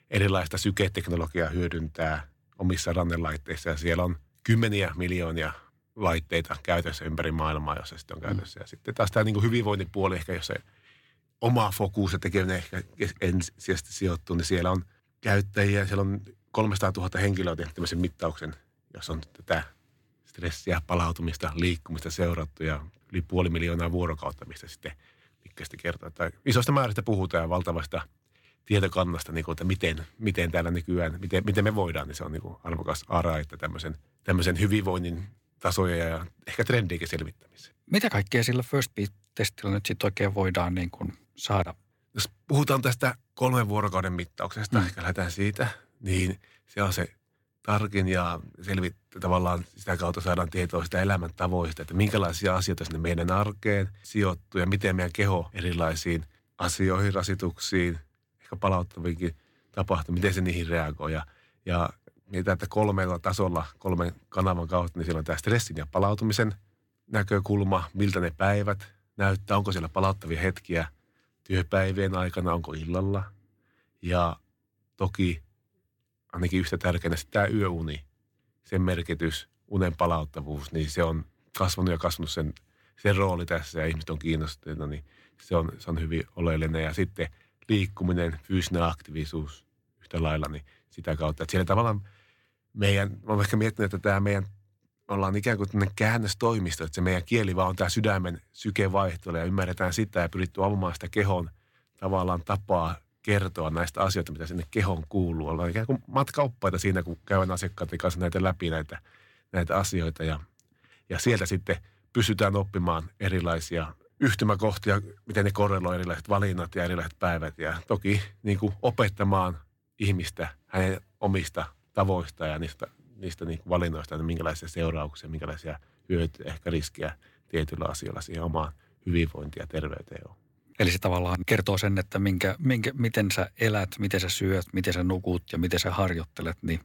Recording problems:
none

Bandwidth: 17 kHz